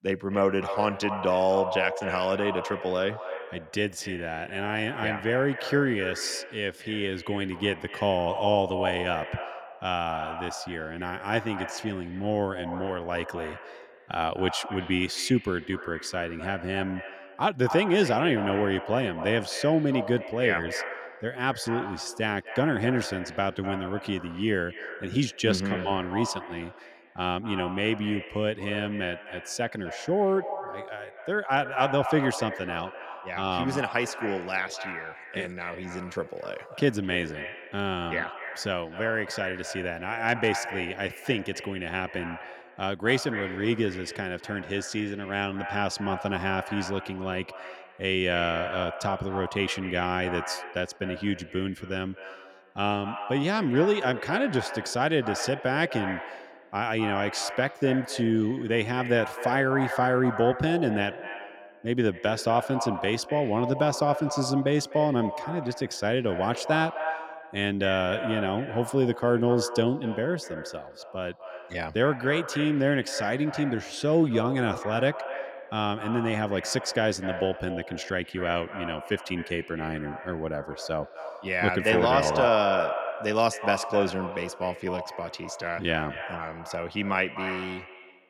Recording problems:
echo of what is said; strong; throughout; 250 ms later, 9 dB below the speech

